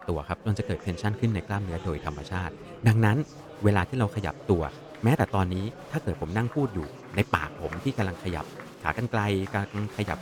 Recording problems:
murmuring crowd; noticeable; throughout; 15 dB below the speech

